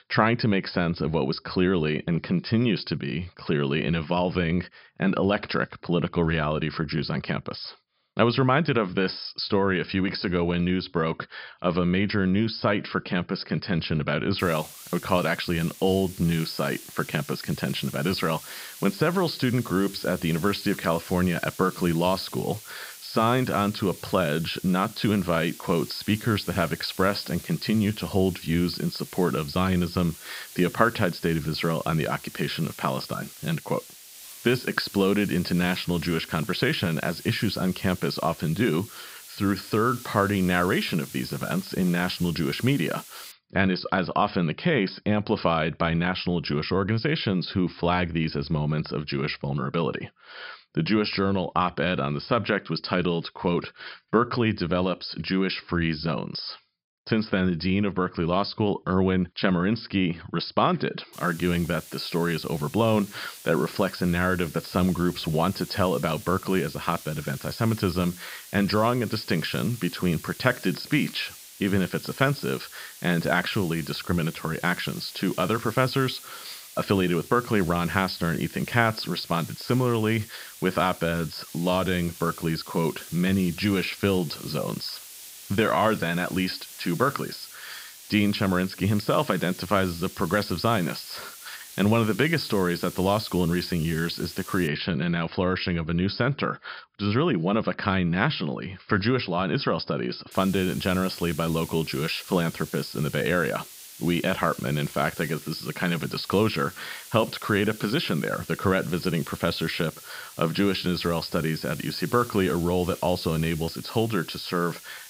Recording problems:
high frequencies cut off; noticeable; nothing above 5.5 kHz
hiss; noticeable; from 14 to 43 s, from 1:01 to 1:35 and from 1:40 on; 15 dB below the speech

